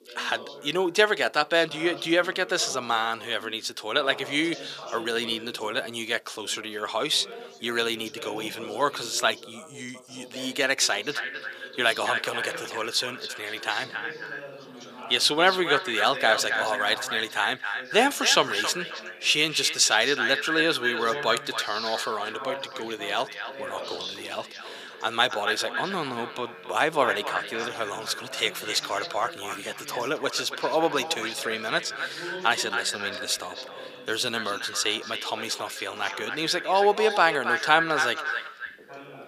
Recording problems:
echo of what is said; strong; from 11 s on; 270 ms later, 7 dB below the speech
thin; somewhat; fading below 400 Hz
background chatter; noticeable; throughout; 2 voices, 15 dB below the speech

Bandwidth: 15 kHz